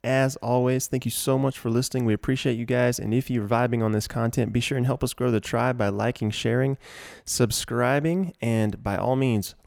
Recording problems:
none

